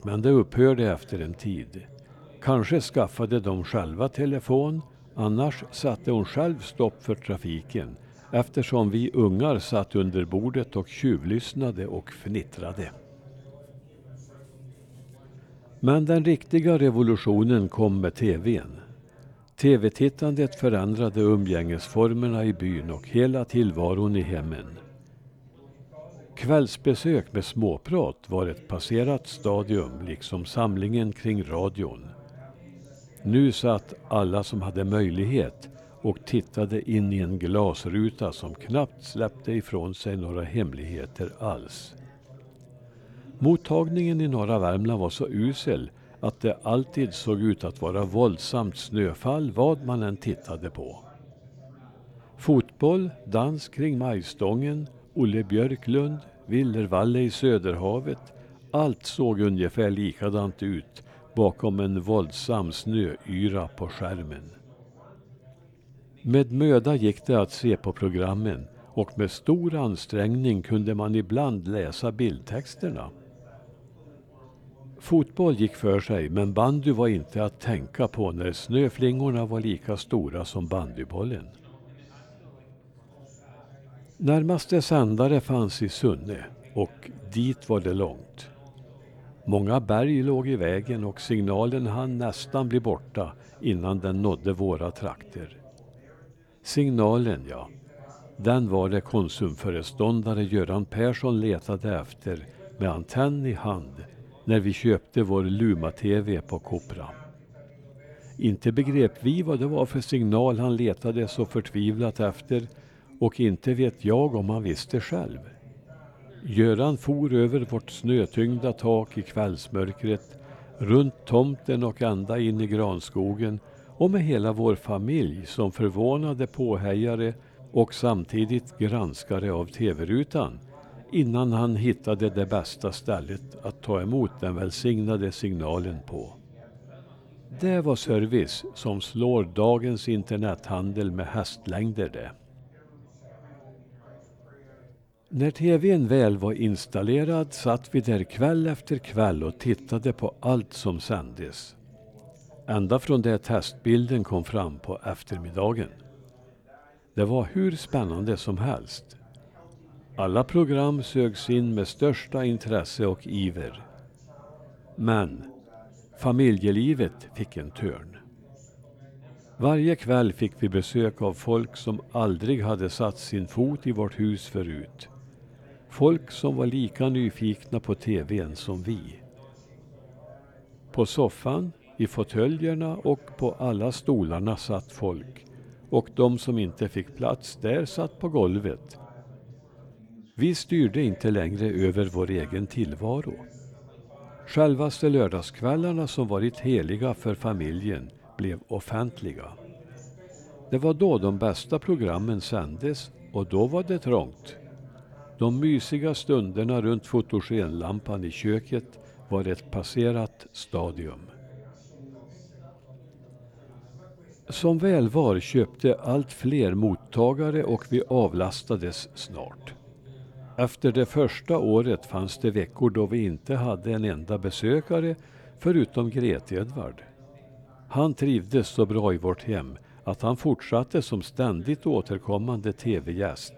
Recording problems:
background chatter; faint; throughout; 4 voices, 25 dB below the speech

